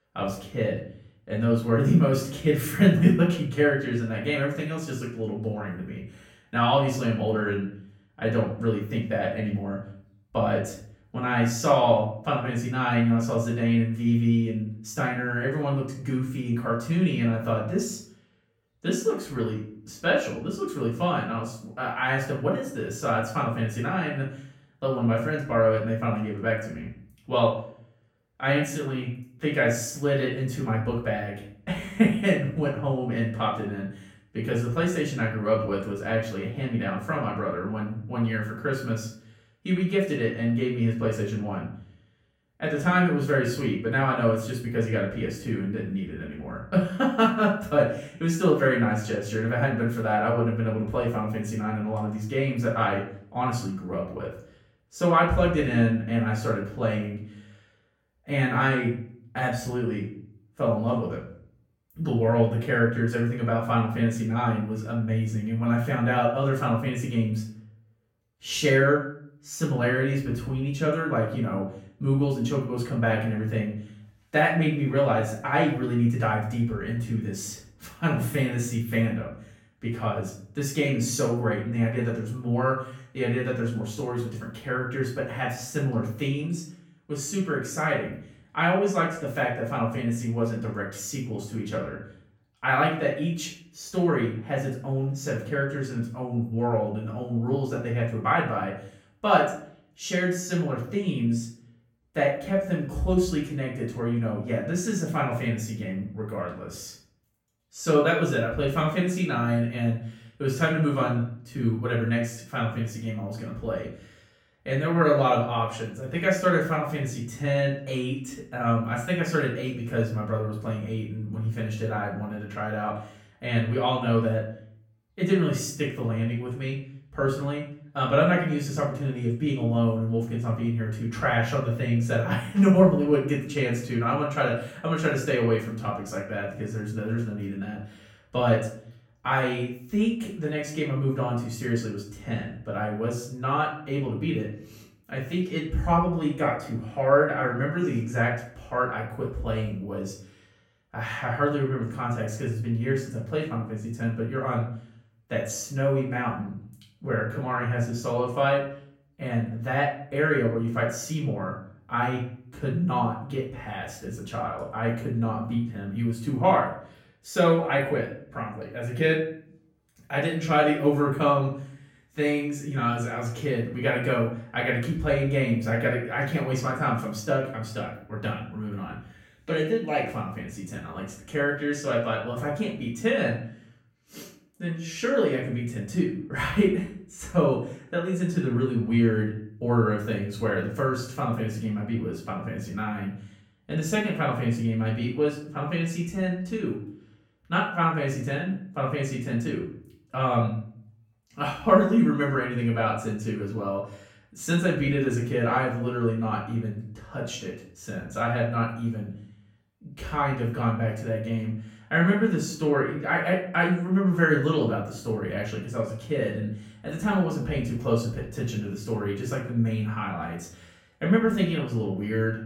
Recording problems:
off-mic speech; far
room echo; noticeable; dies away in 0.5 s

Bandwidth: 17.5 kHz